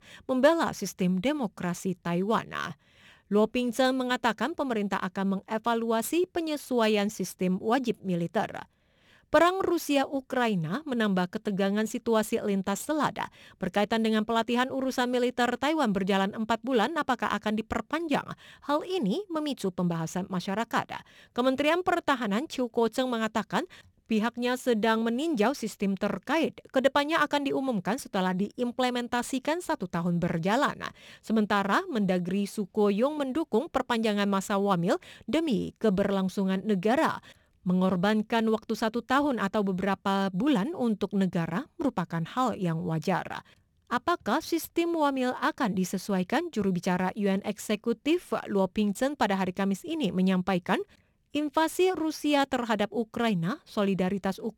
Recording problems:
none

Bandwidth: 18.5 kHz